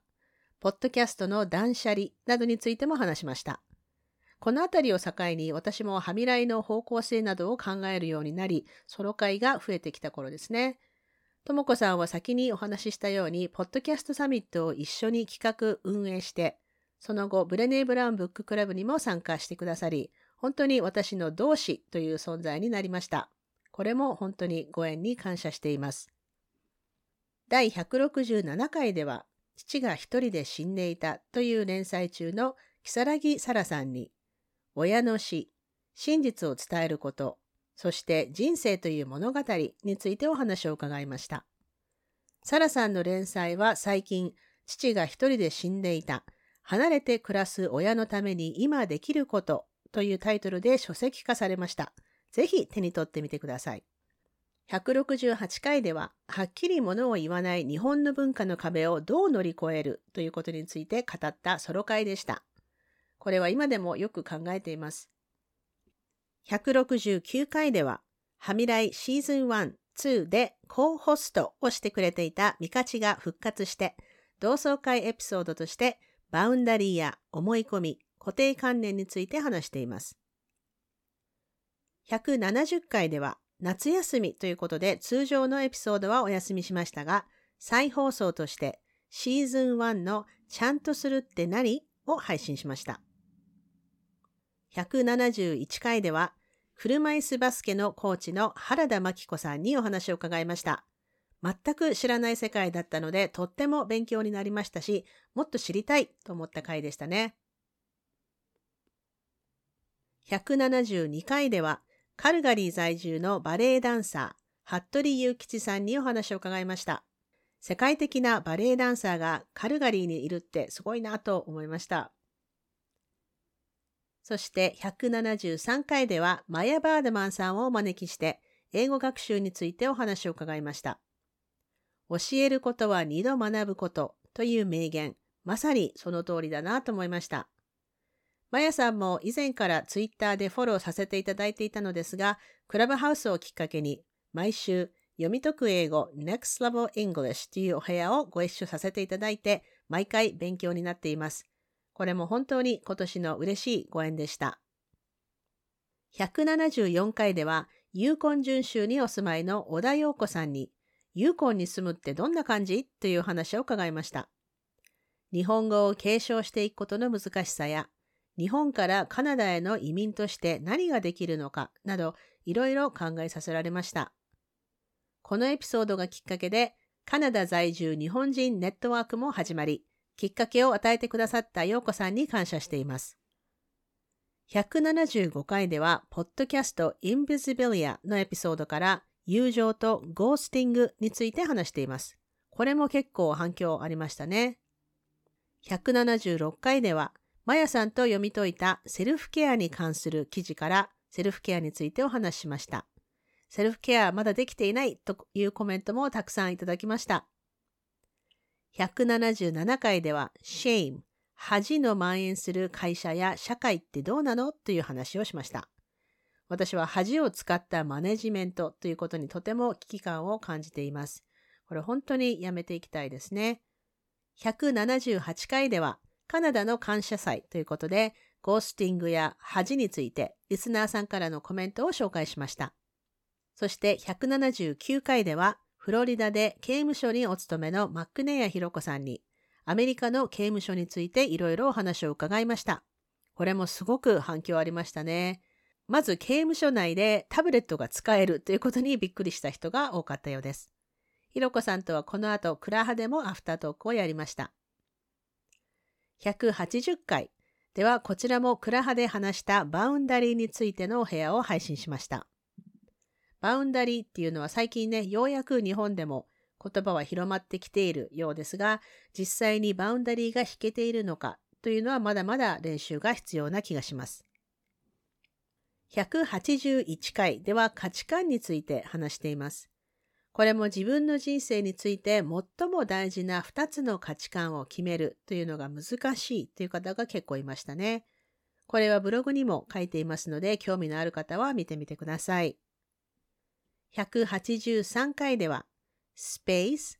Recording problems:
none

